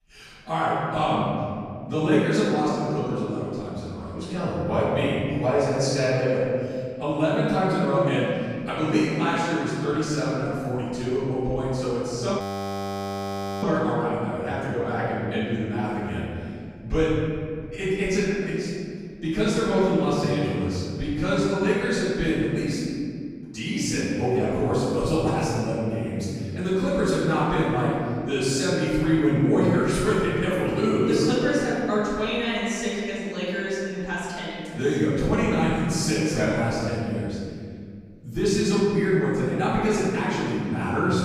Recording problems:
room echo; strong; dies away in 2.3 s
off-mic speech; far
audio freezing; at 12 s for 1 s

